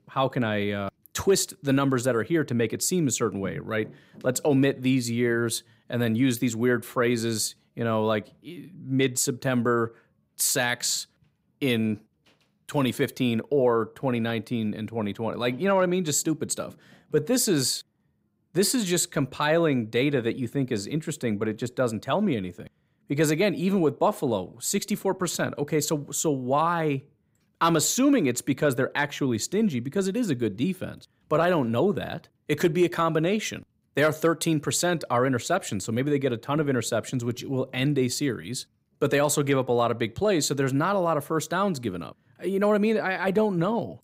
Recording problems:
none

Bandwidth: 15.5 kHz